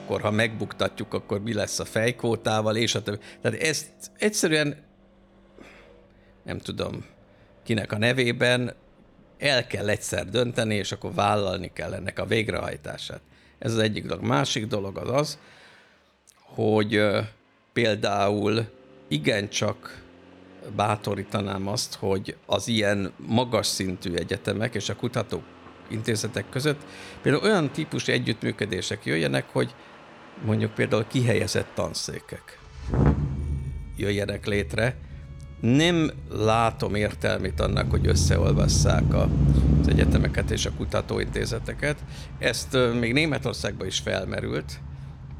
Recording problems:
traffic noise; loud; throughout; 2 dB below the speech
background music; faint; throughout; 30 dB below the speech

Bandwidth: 18.5 kHz